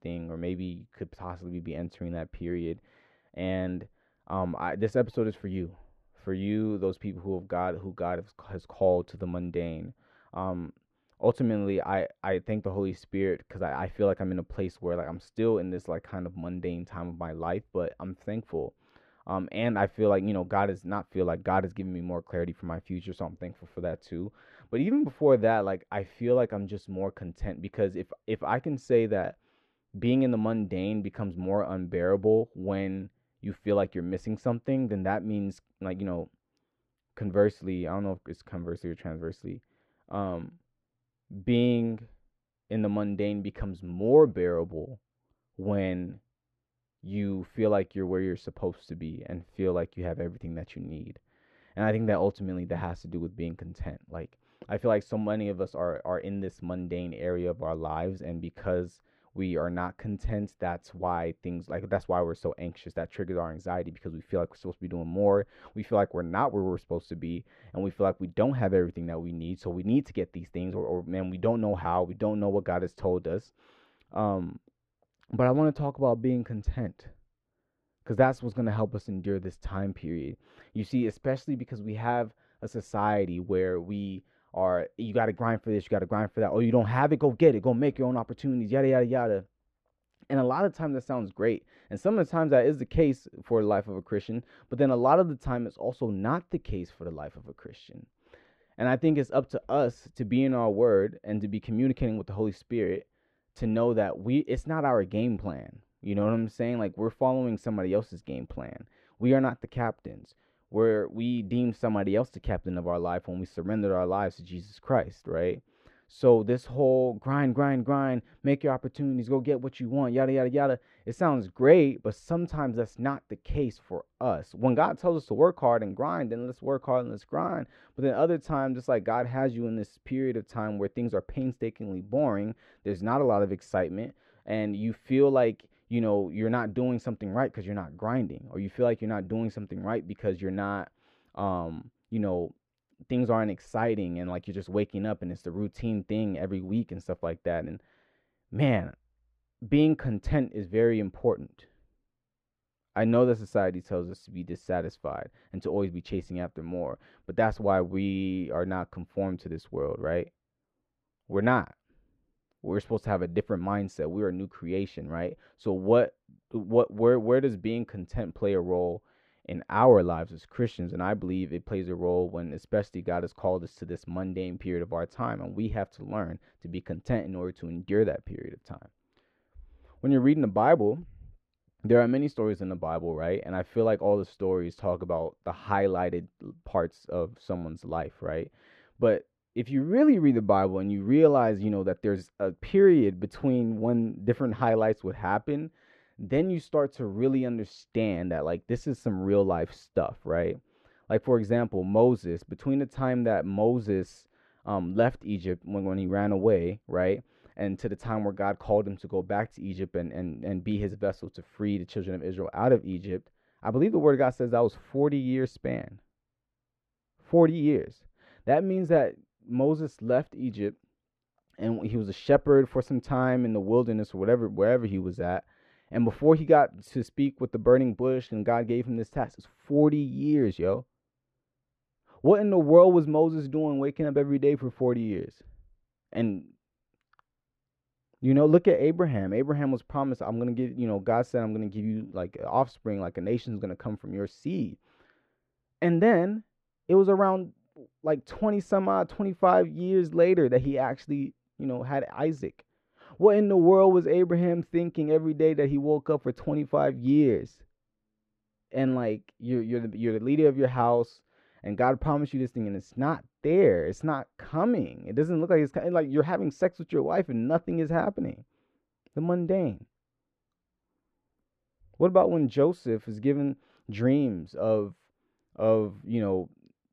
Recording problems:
muffled; very; fading above 3.5 kHz

